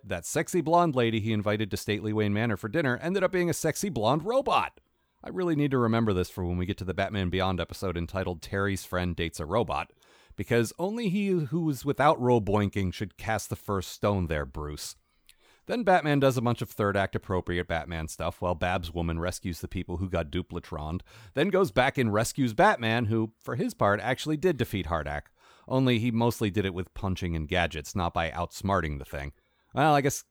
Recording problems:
none

